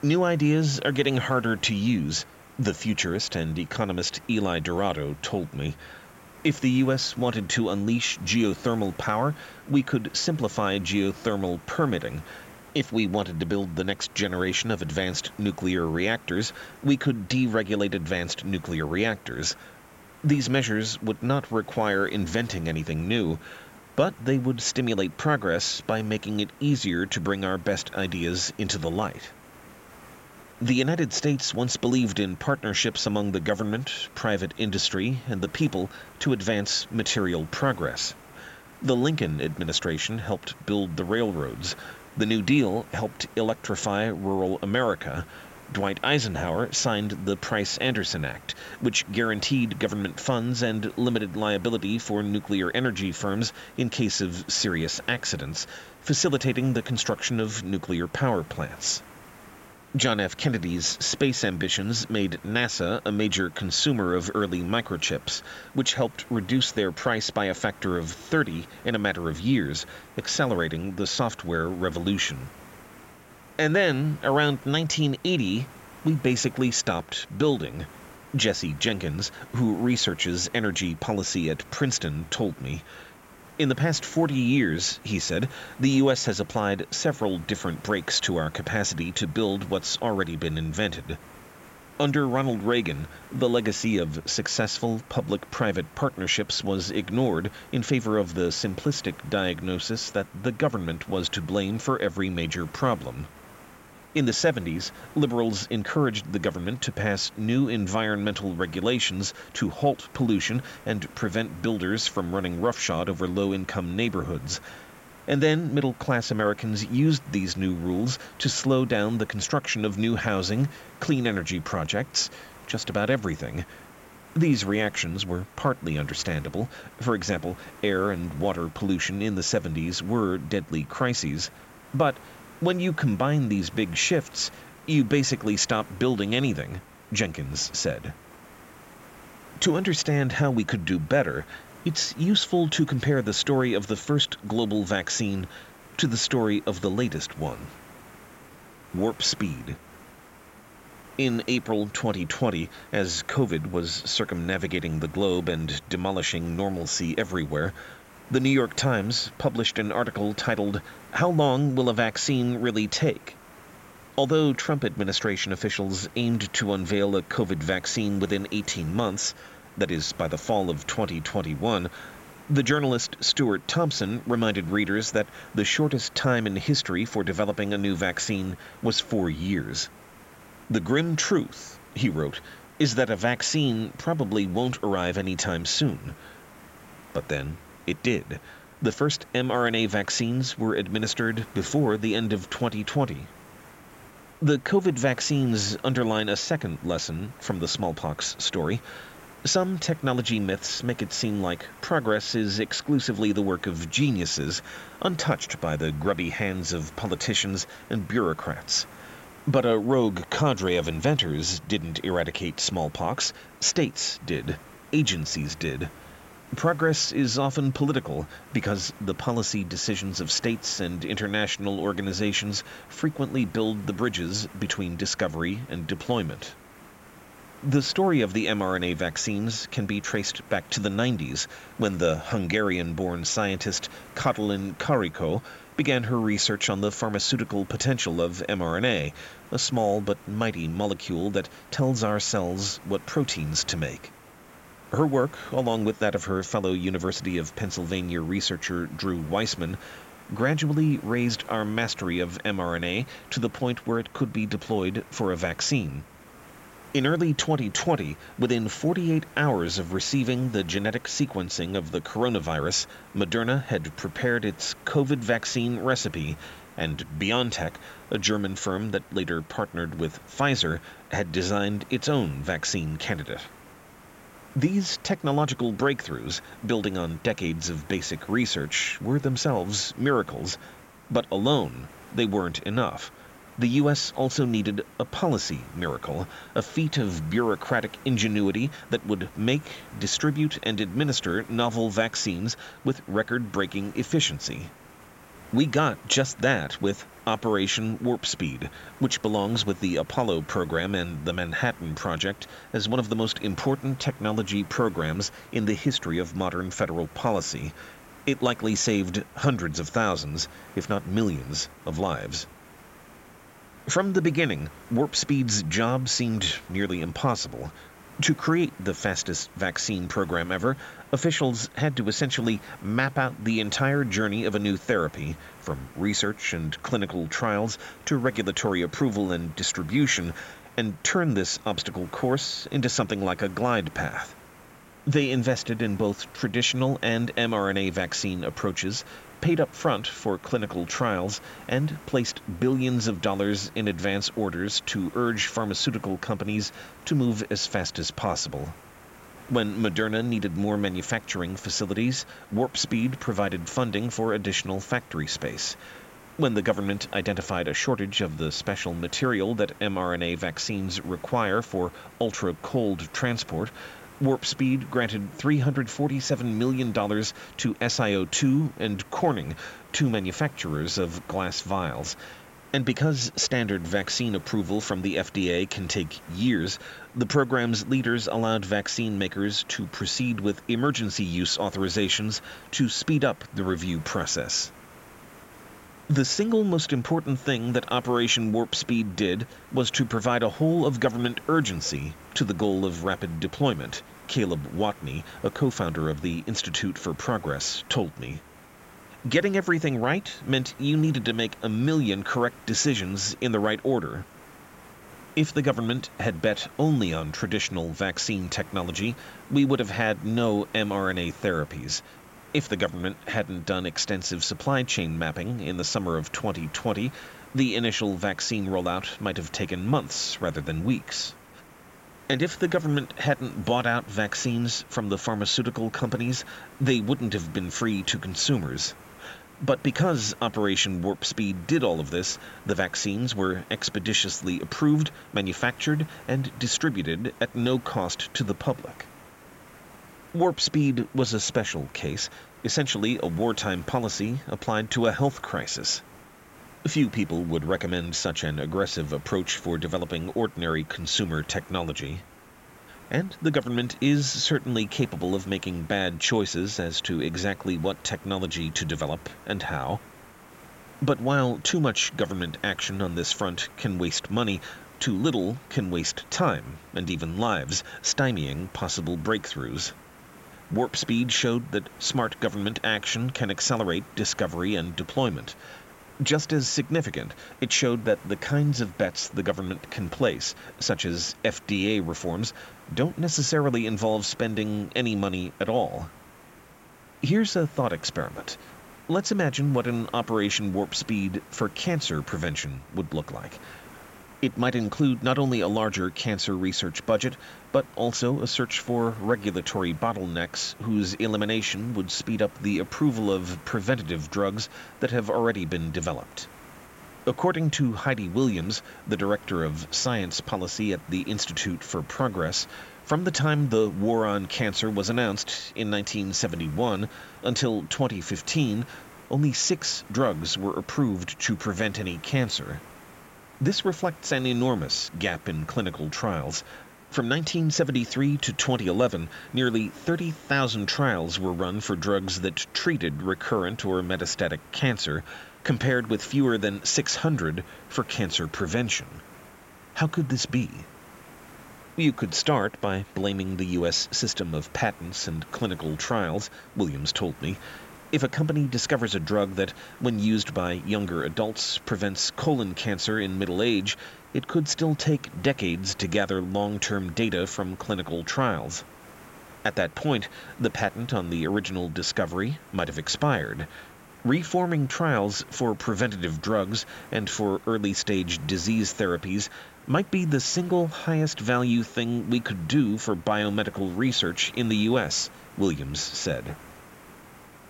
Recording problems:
high frequencies cut off; noticeable; nothing above 8 kHz
hiss; faint; throughout; 20 dB below the speech

